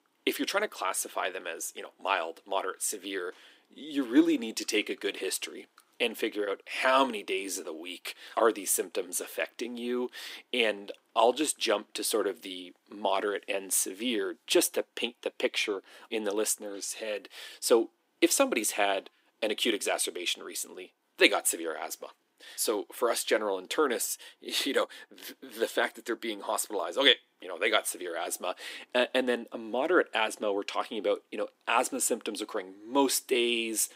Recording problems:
thin; somewhat; fading below 300 Hz

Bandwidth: 15.5 kHz